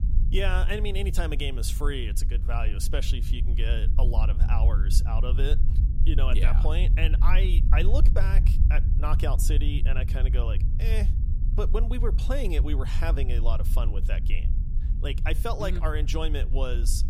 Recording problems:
low rumble; noticeable; throughout; 10 dB below the speech

